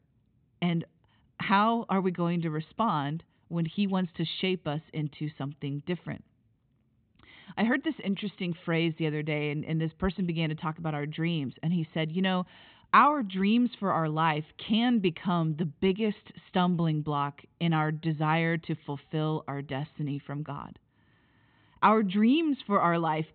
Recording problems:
high frequencies cut off; severe; nothing above 4 kHz

